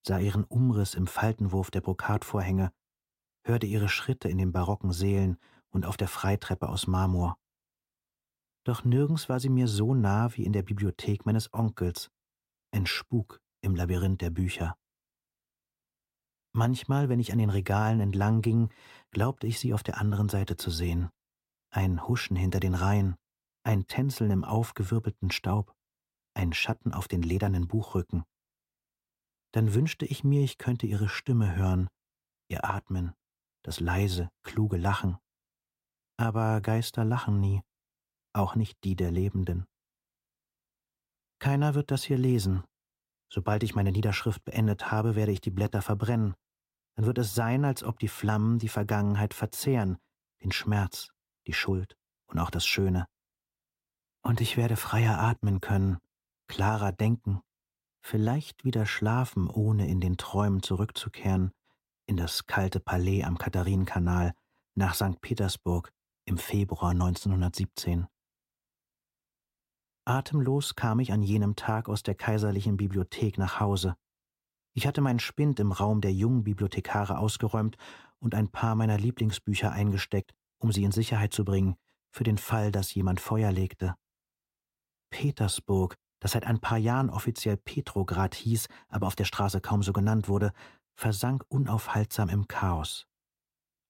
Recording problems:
none

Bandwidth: 16 kHz